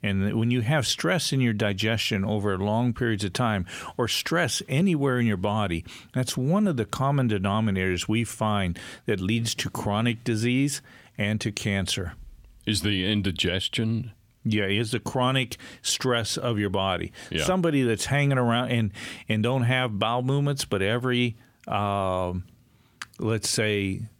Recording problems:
none

